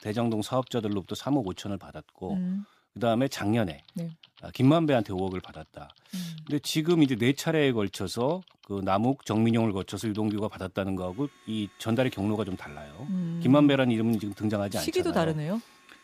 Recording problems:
household noises; faint; throughout; 25 dB below the speech

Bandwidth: 15 kHz